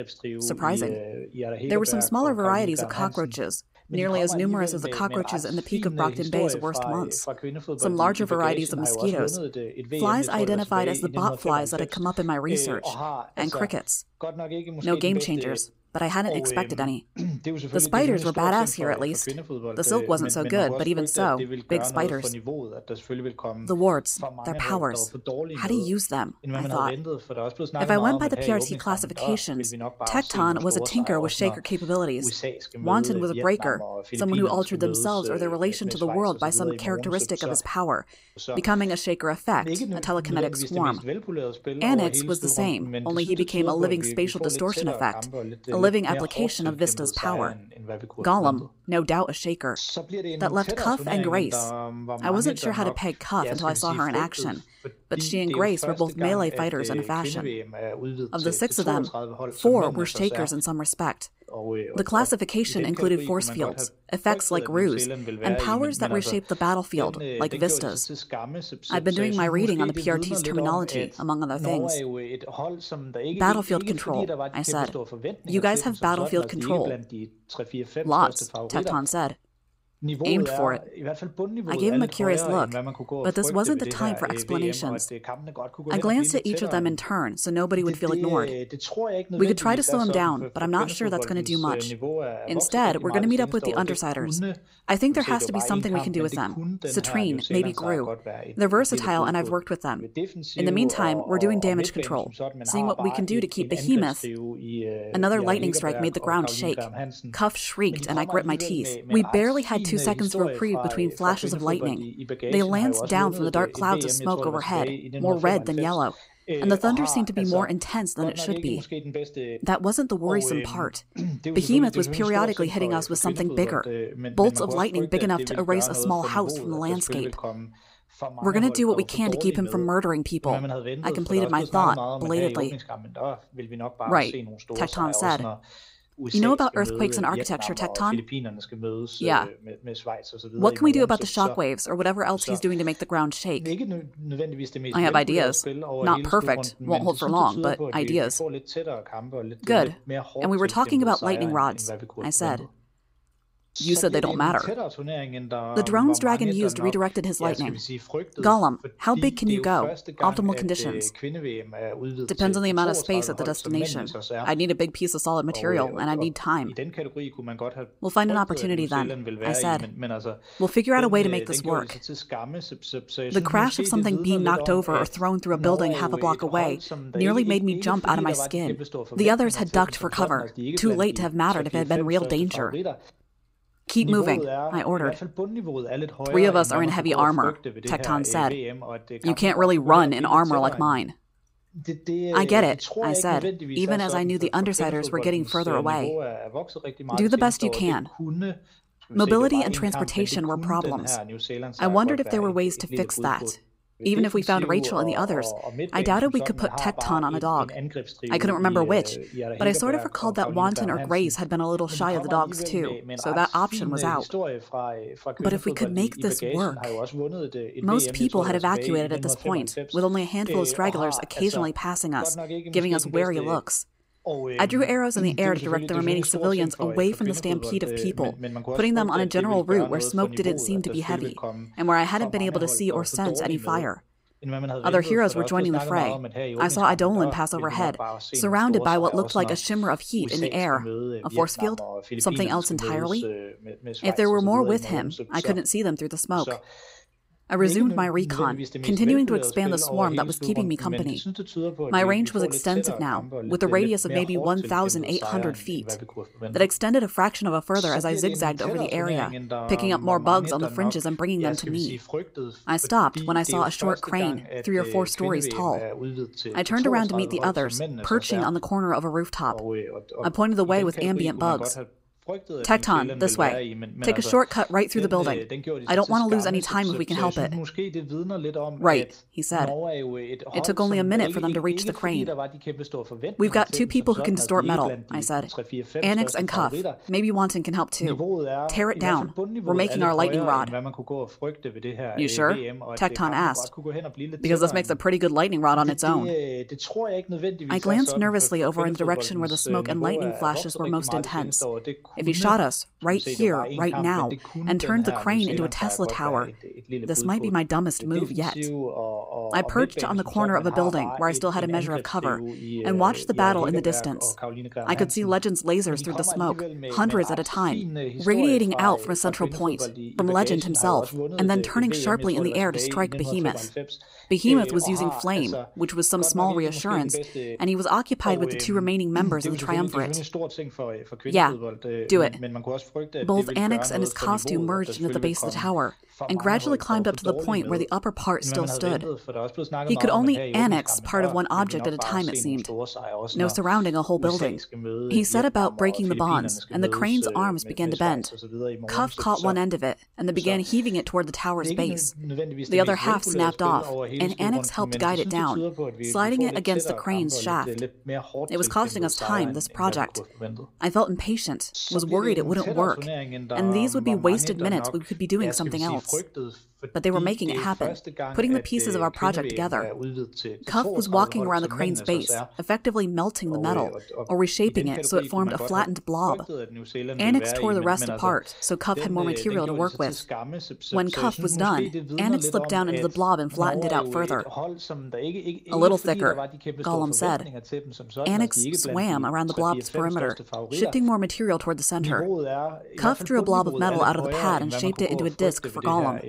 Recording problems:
voice in the background; loud; throughout; 8 dB below the speech

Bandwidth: 15.5 kHz